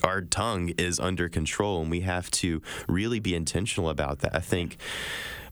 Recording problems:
squashed, flat; somewhat

